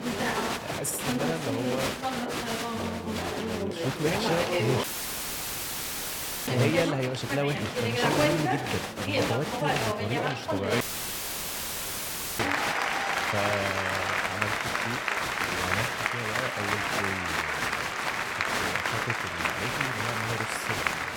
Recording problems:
crowd noise; very loud; throughout; 5 dB above the speech
audio cutting out; at 5 s for 1.5 s and at 11 s for 1.5 s

